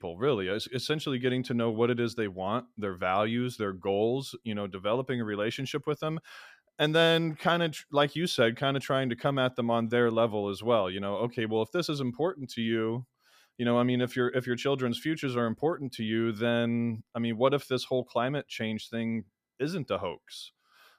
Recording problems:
none

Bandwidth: 14.5 kHz